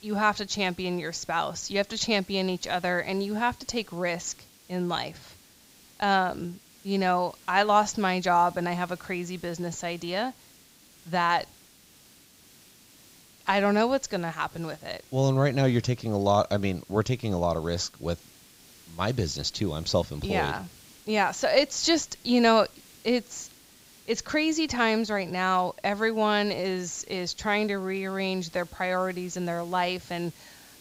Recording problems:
high frequencies cut off; noticeable; nothing above 8 kHz
hiss; faint; throughout; 25 dB below the speech

